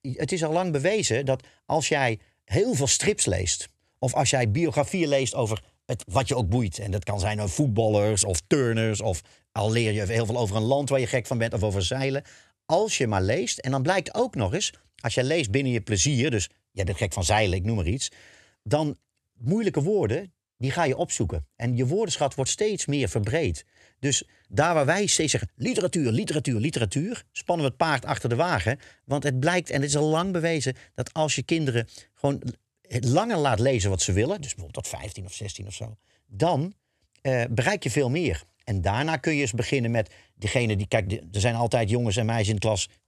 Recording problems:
none

